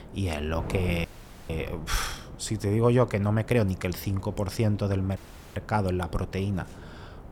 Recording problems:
wind noise on the microphone; occasional gusts; 15 dB below the speech
audio cutting out; at 1 s and at 5 s

